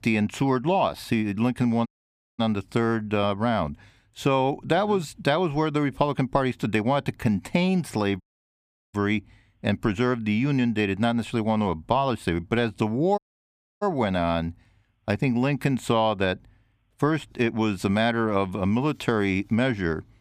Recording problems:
audio cutting out; at 2 s for 0.5 s, at 8 s for 0.5 s and at 13 s for 0.5 s

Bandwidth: 15 kHz